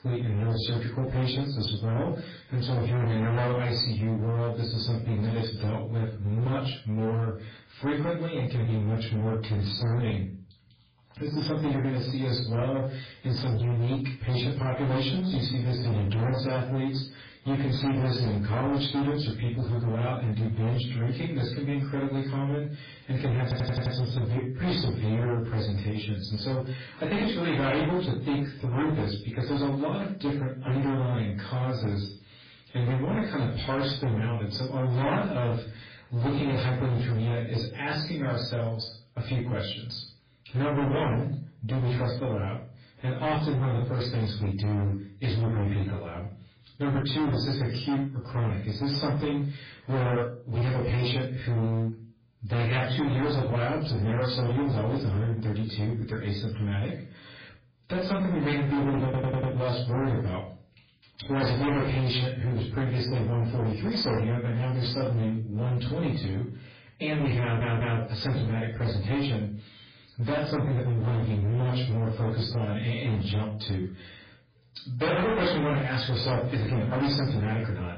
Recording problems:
distortion; heavy; 23% of the sound clipped
off-mic speech; far
garbled, watery; badly; nothing above 4.5 kHz
room echo; slight; dies away in 0.3 s
audio stuttering; at 23 s, at 59 s and at 1:07

